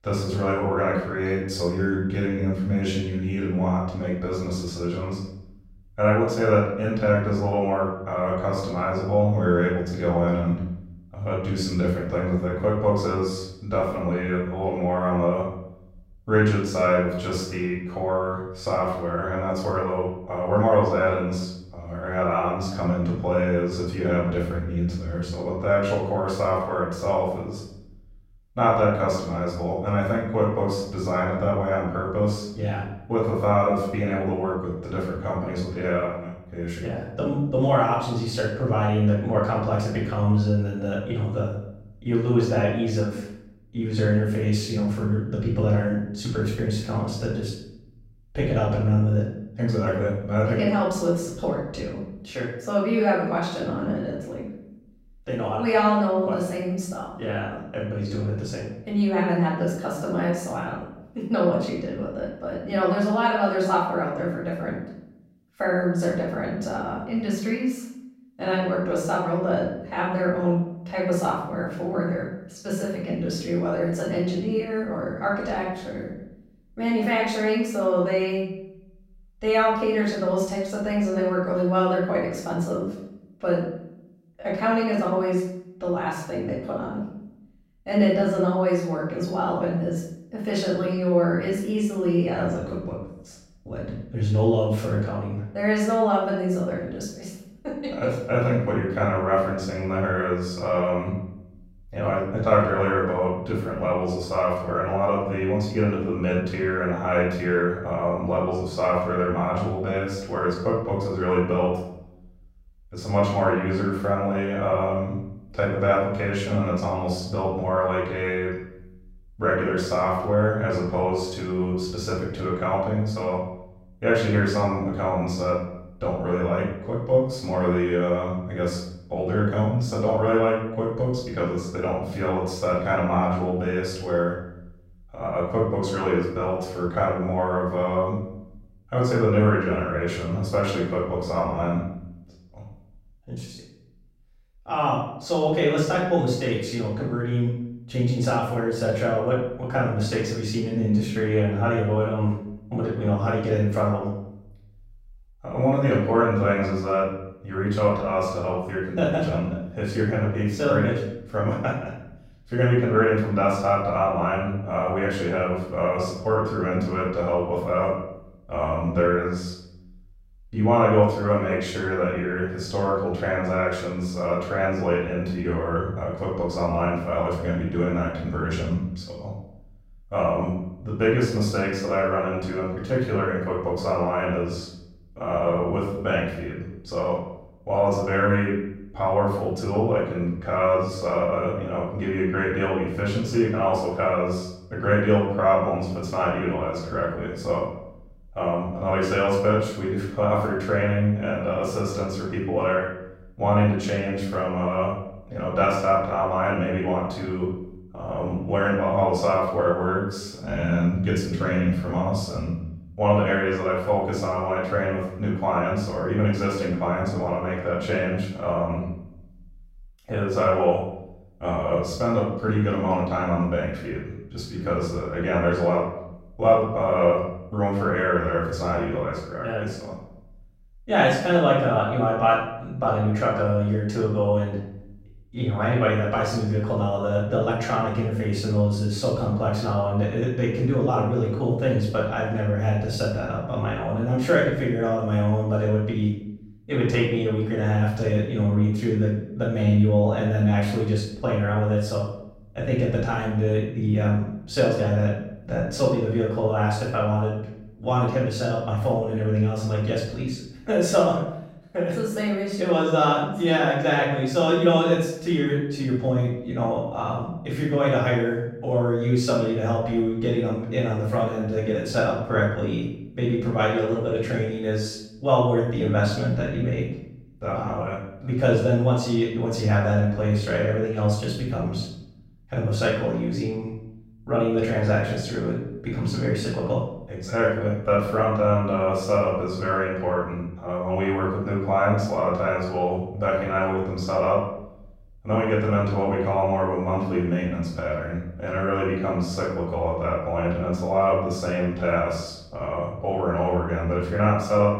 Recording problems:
off-mic speech; far
room echo; noticeable; dies away in 0.7 s

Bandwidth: 16 kHz